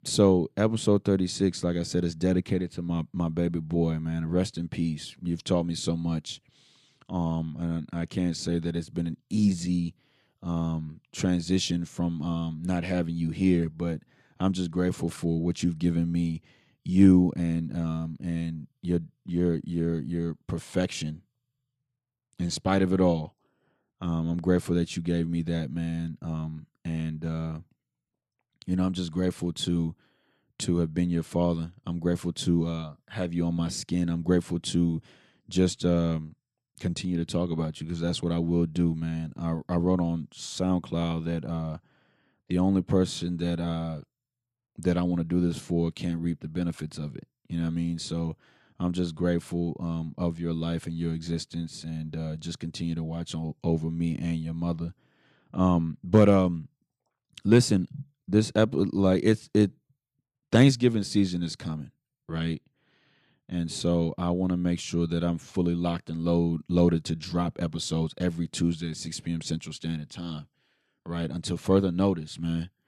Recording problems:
none

